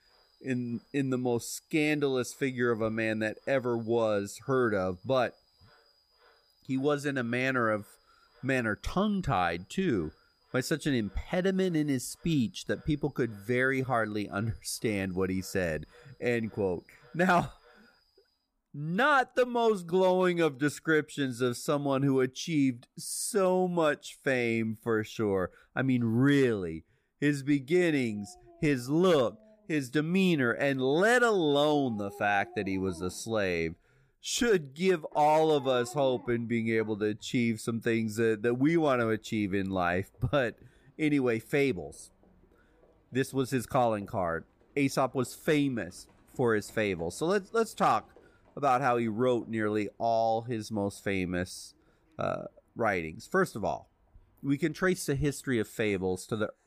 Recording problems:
animal sounds; faint; throughout; 30 dB below the speech

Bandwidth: 15 kHz